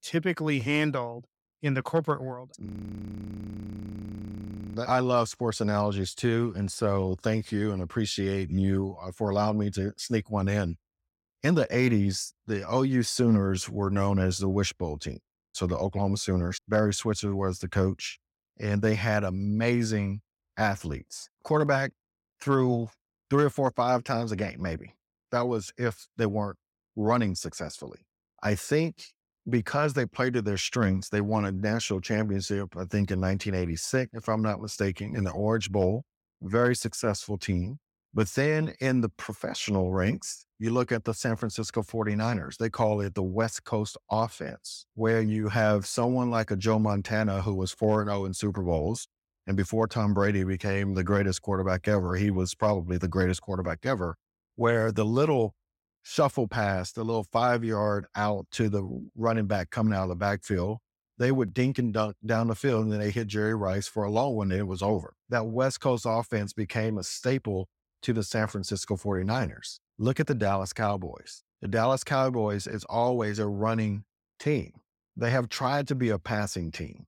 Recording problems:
audio freezing; at 2.5 s for 2 s

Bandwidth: 16.5 kHz